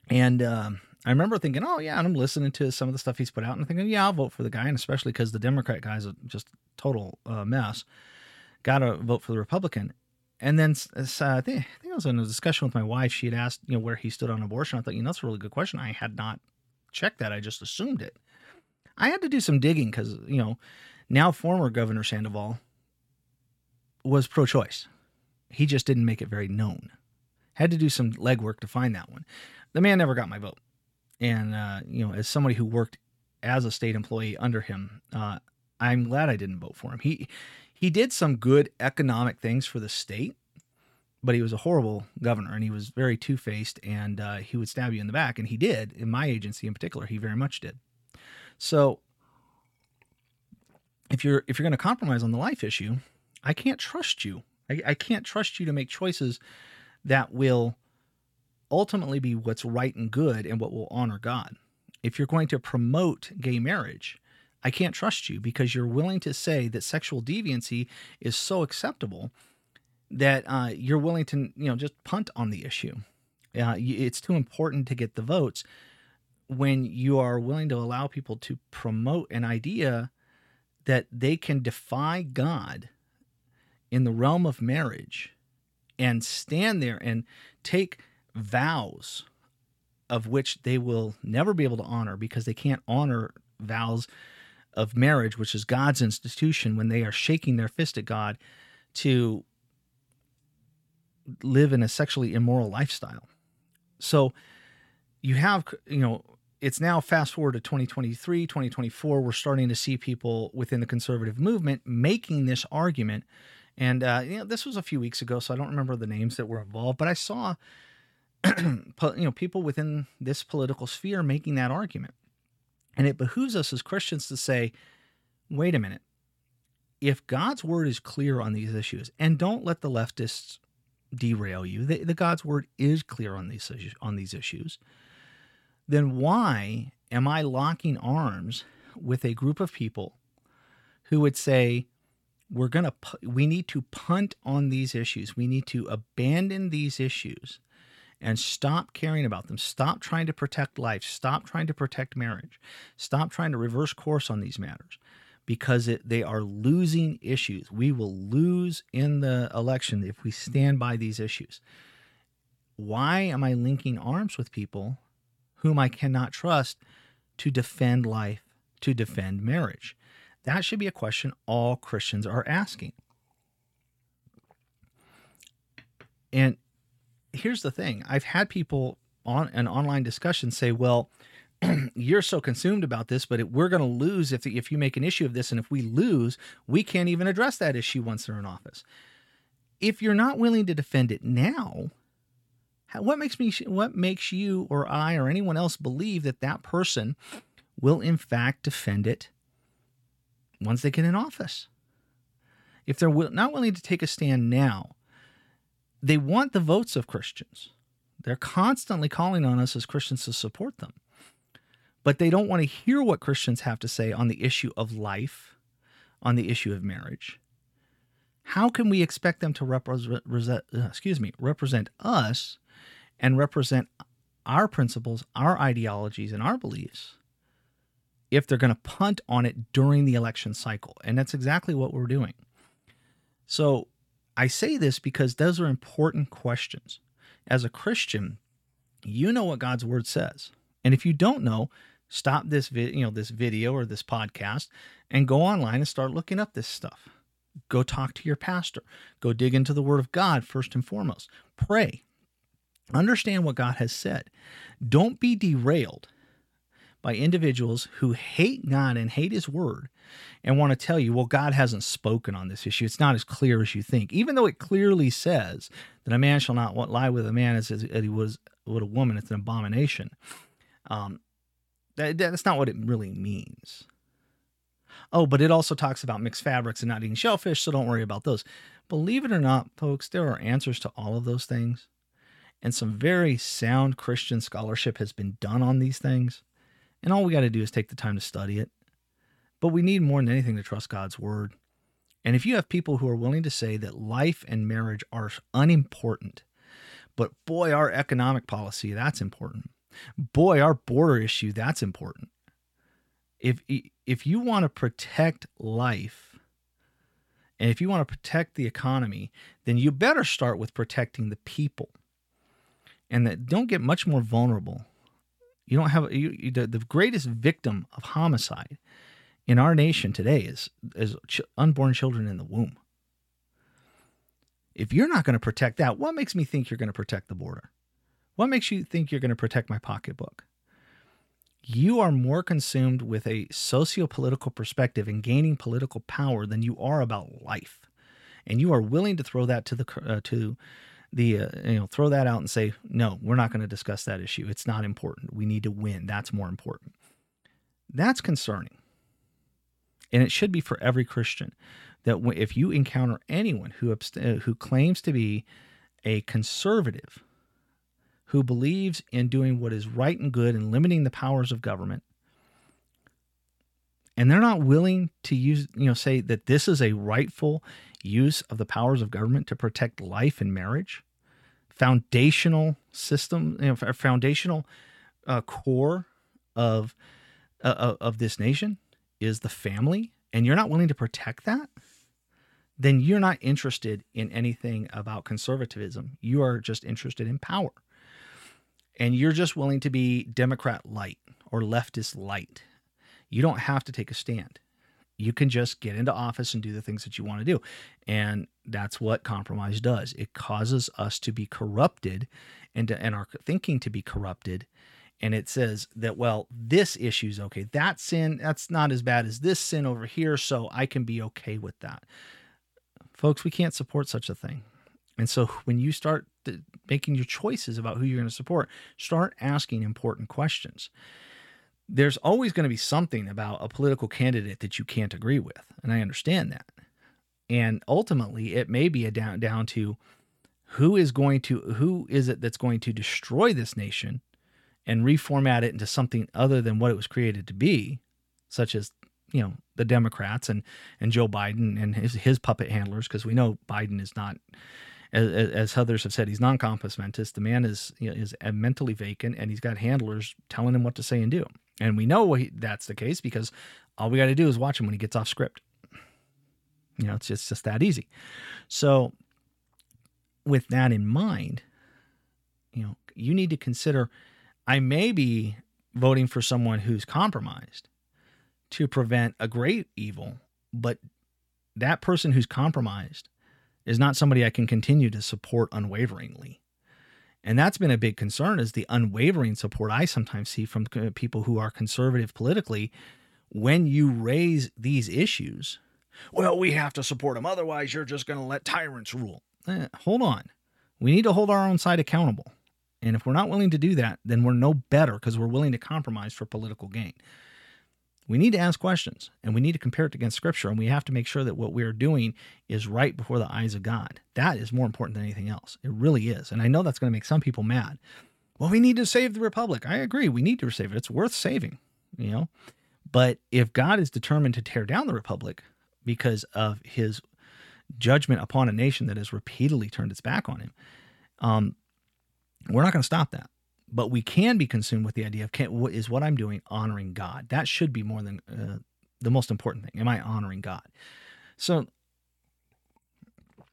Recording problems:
none

